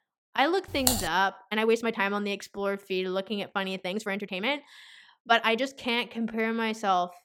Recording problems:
uneven, jittery; strongly; from 0.5 to 6.5 s
keyboard typing; loud; at 1 s; peak 2 dB above the speech

